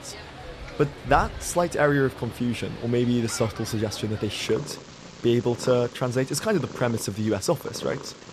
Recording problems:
animal sounds; noticeable; throughout; 15 dB below the speech

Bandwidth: 13.5 kHz